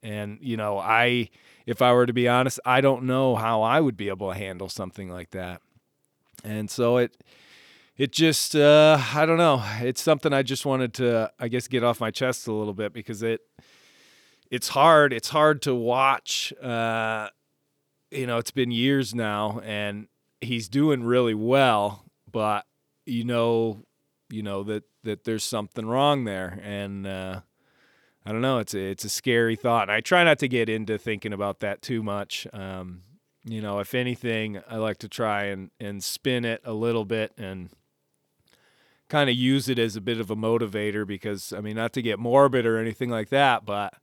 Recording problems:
none

